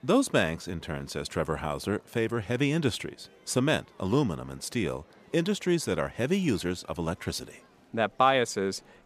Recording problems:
murmuring crowd; faint; throughout; 30 dB below the speech

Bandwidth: 14.5 kHz